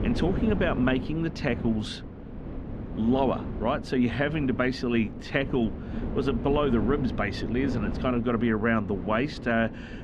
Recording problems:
muffled; slightly; fading above 3 kHz
wind noise on the microphone; occasional gusts; 10 dB below the speech

